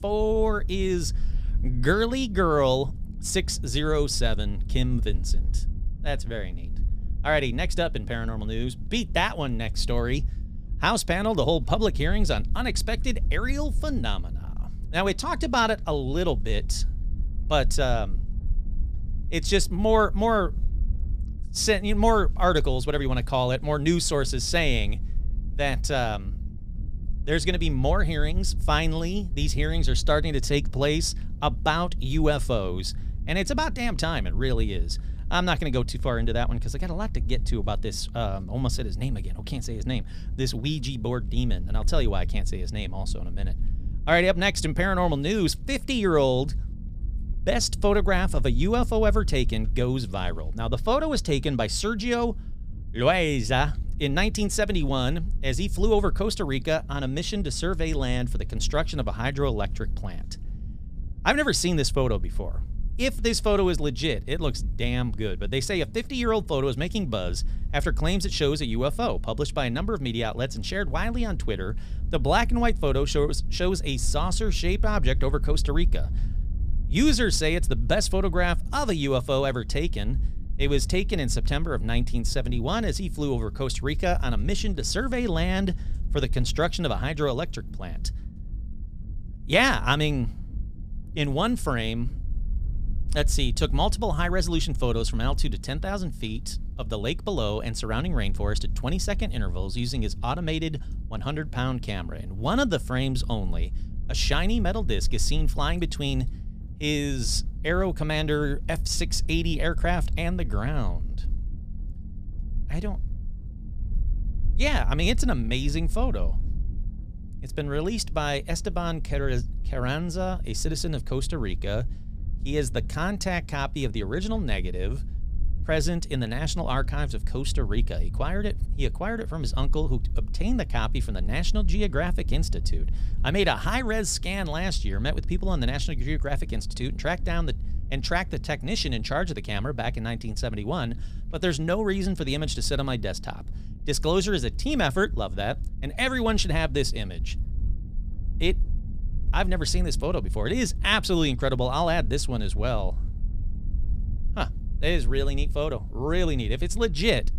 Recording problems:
low rumble; faint; throughout; 25 dB below the speech

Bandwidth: 15 kHz